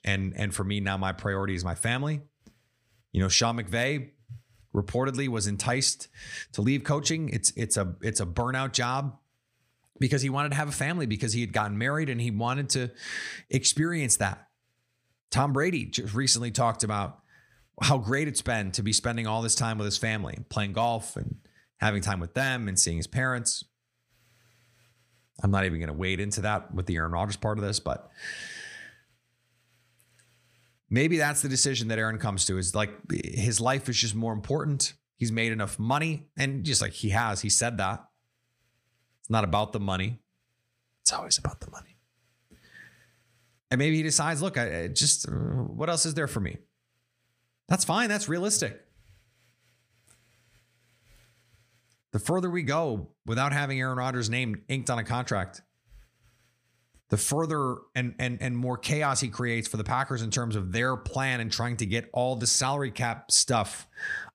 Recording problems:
none

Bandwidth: 15 kHz